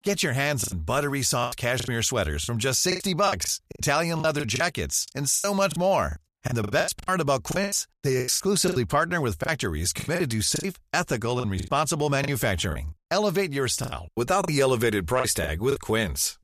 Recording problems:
choppy; very; 14% of the speech affected

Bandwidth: 14.5 kHz